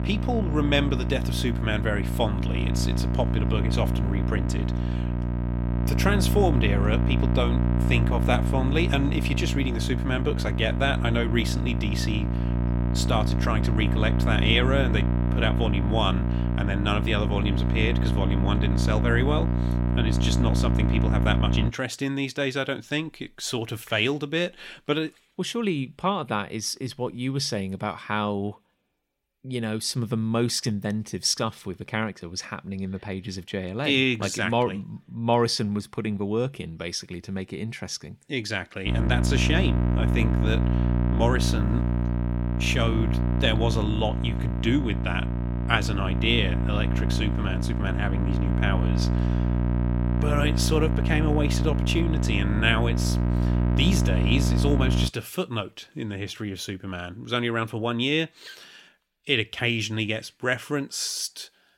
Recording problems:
electrical hum; loud; until 22 s and from 39 to 55 s; 60 Hz, 6 dB below the speech

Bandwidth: 16 kHz